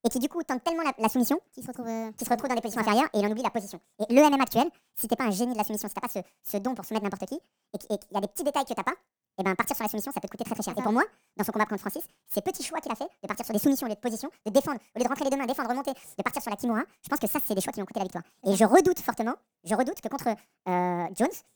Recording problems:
wrong speed and pitch; too fast and too high; 1.7 times normal speed

